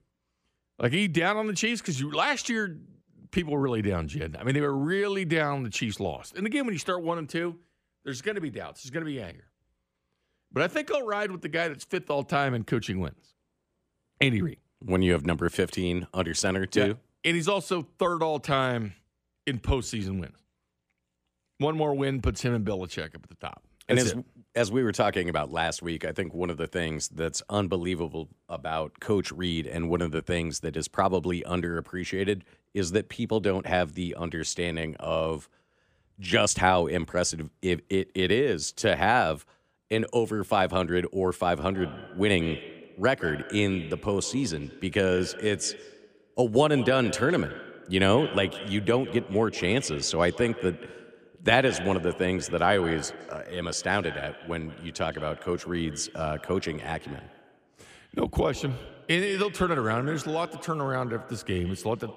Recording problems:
echo of what is said; noticeable; from 42 s on; 160 ms later, 15 dB below the speech

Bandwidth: 15 kHz